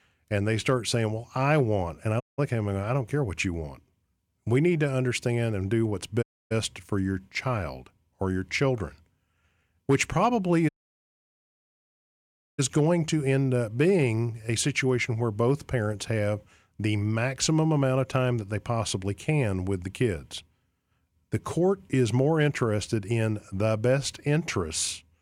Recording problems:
audio cutting out; at 2 s, at 6 s and at 11 s for 2 s

